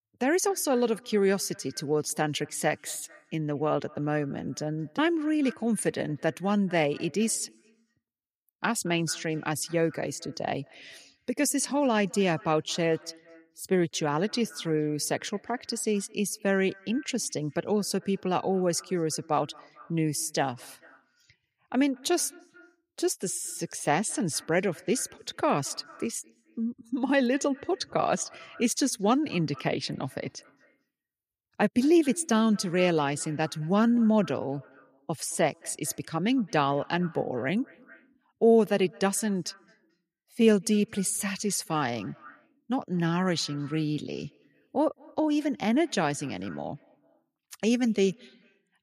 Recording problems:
echo of what is said; faint; throughout; 220 ms later, 25 dB below the speech

